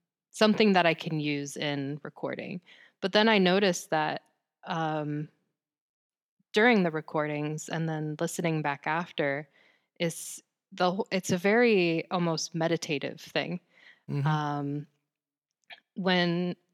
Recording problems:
none

